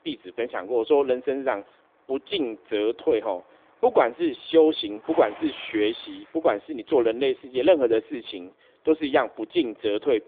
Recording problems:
phone-call audio
traffic noise; faint; throughout; 20 dB below the speech

